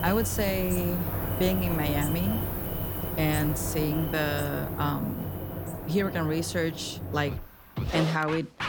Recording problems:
animal sounds; loud; throughout; 5 dB below the speech
background music; loud; throughout; 6 dB below the speech

